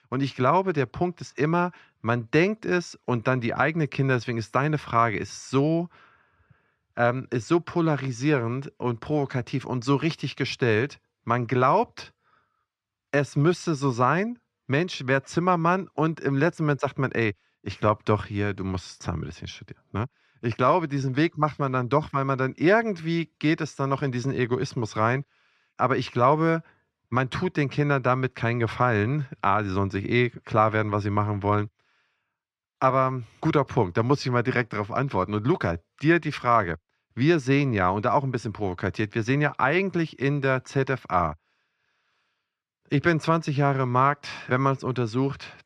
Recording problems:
muffled; slightly; fading above 3 kHz

